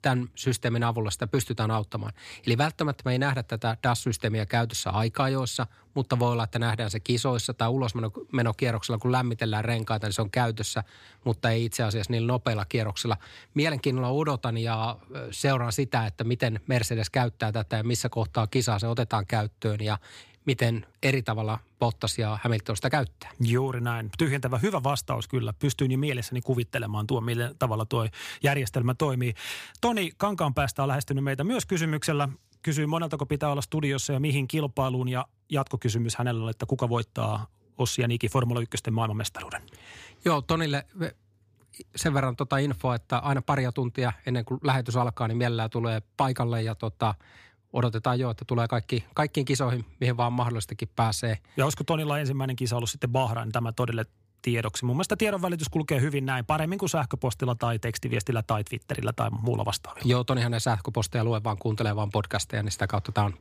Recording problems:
none

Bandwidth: 15 kHz